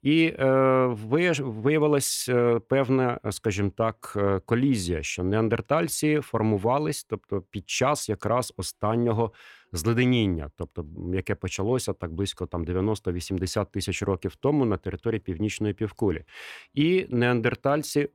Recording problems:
none

